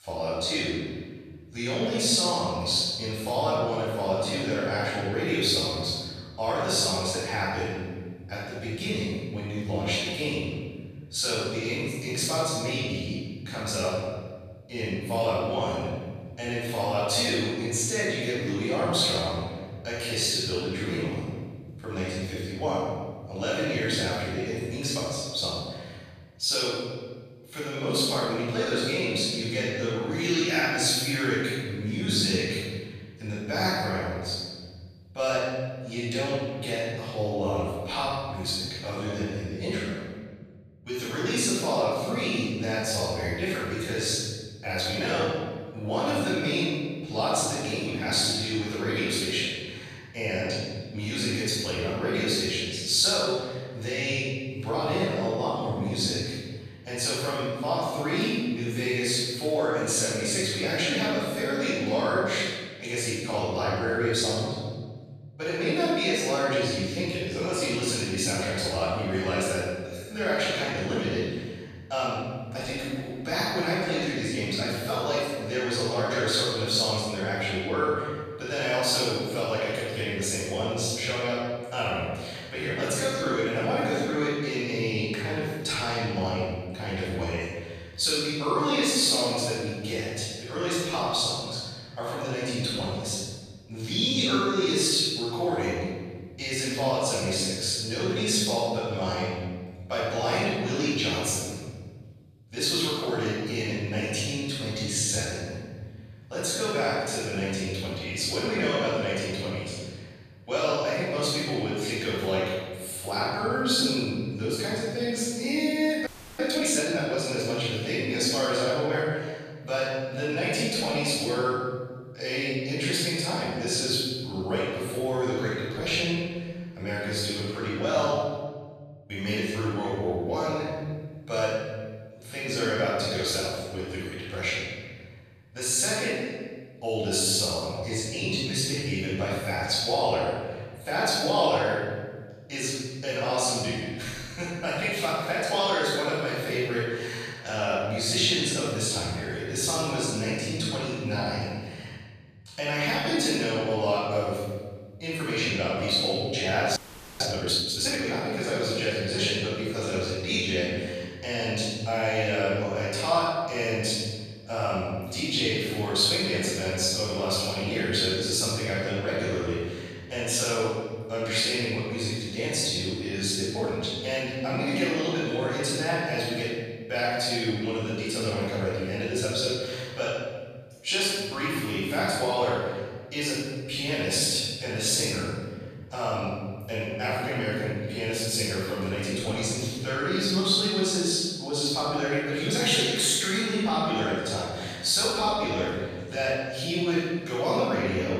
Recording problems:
room echo; strong; dies away in 2 s
off-mic speech; far
thin; very slightly; fading below 1 kHz
audio freezing; at 1:56 and at 2:37

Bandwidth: 14.5 kHz